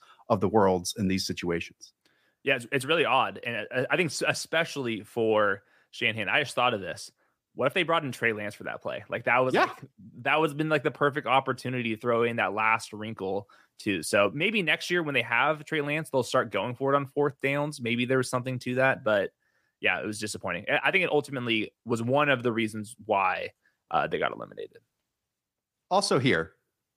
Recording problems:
none

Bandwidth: 15 kHz